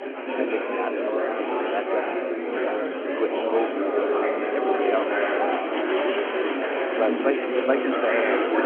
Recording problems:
phone-call audio
murmuring crowd; very loud; throughout; 5 dB above the speech

